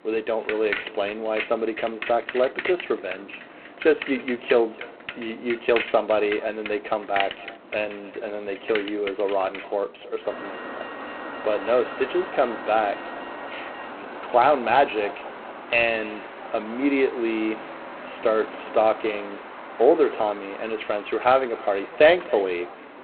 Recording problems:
phone-call audio; poor line; nothing above 4 kHz
echo of what is said; faint; throughout; 280 ms later, 20 dB below the speech
traffic noise; noticeable; throughout; 10 dB below the speech

